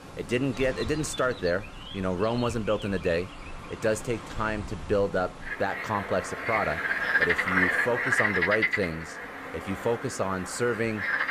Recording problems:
animal sounds; very loud; throughout; as loud as the speech

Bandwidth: 15 kHz